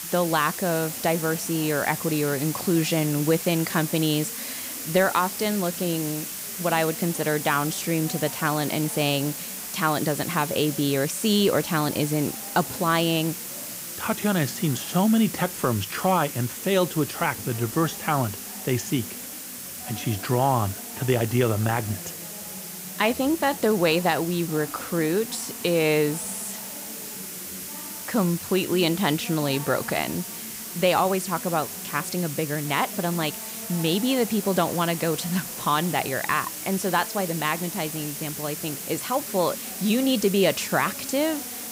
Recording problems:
hiss; loud; throughout; 7 dB below the speech
chatter from many people; noticeable; throughout; 20 dB below the speech

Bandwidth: 15.5 kHz